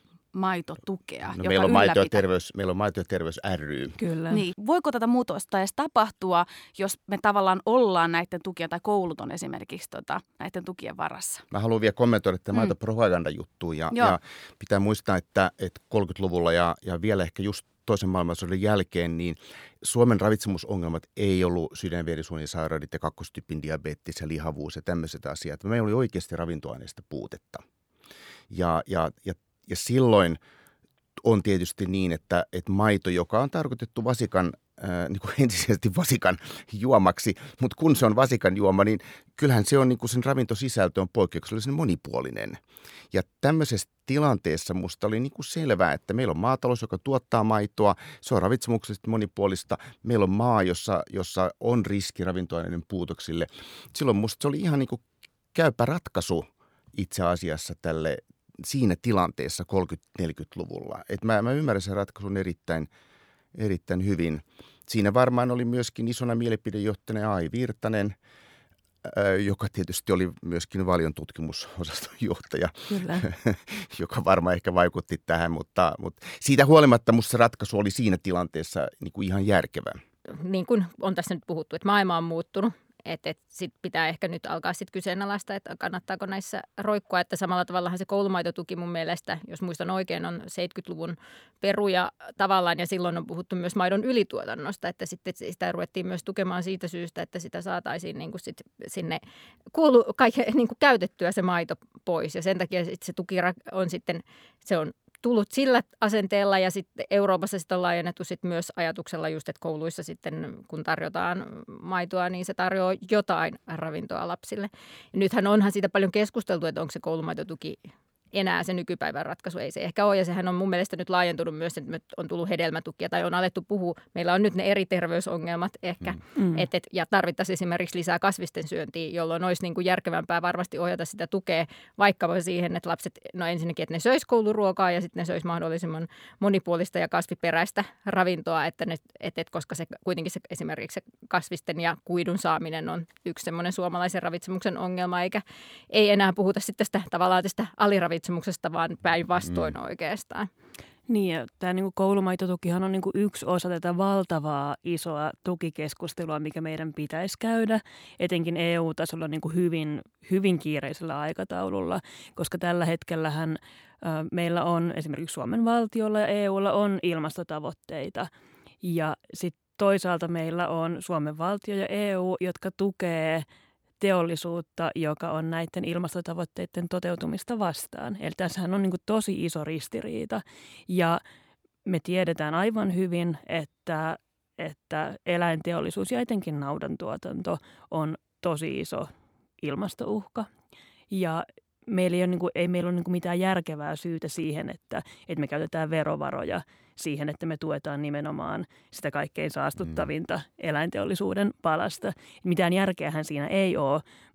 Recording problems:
none

